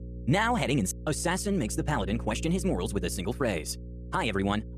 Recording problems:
wrong speed, natural pitch; too fast; 1.5 times normal speed
electrical hum; noticeable; throughout; 60 Hz, 20 dB below the speech

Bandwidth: 14.5 kHz